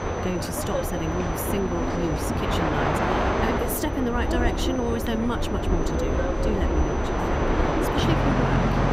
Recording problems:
train or aircraft noise; very loud; throughout; 5 dB above the speech
high-pitched whine; noticeable; throughout; 6 kHz, 20 dB below the speech

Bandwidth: 15.5 kHz